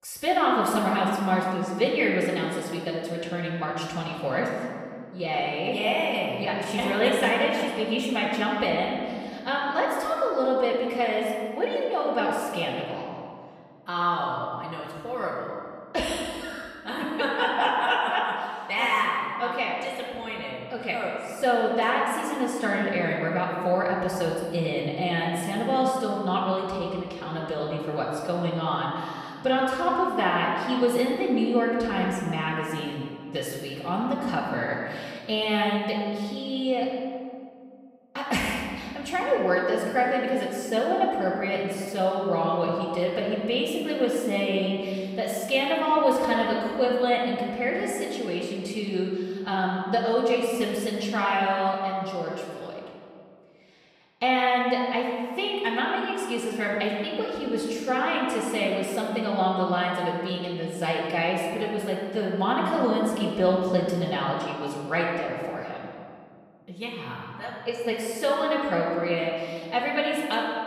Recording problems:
off-mic speech; far
room echo; noticeable; dies away in 1.9 s

